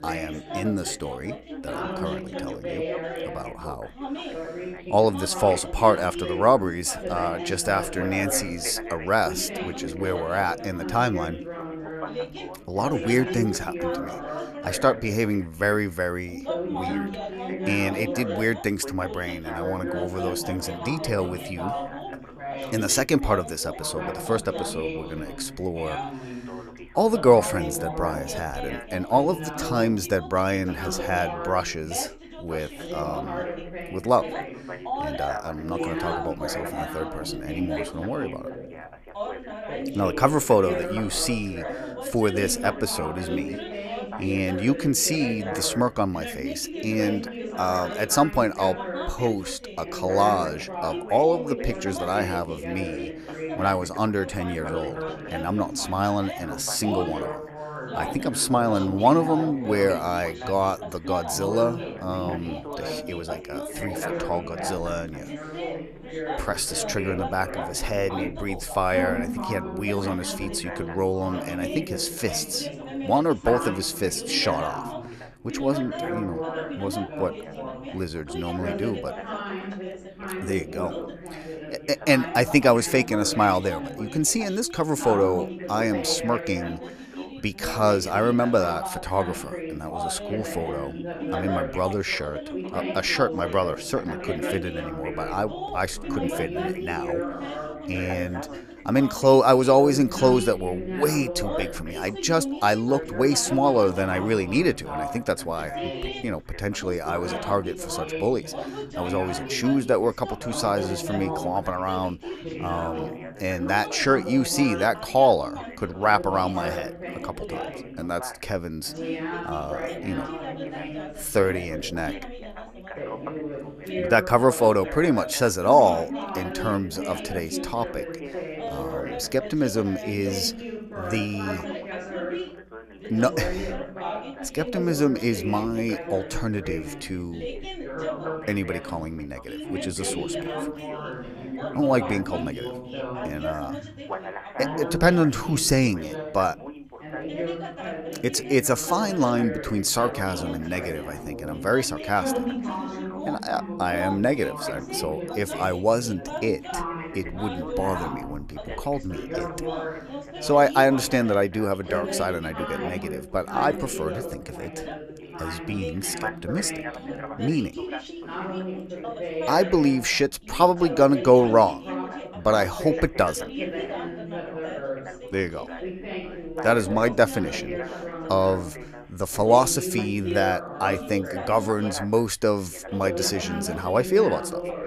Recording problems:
background chatter; loud; throughout; 3 voices, 8 dB below the speech

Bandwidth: 14.5 kHz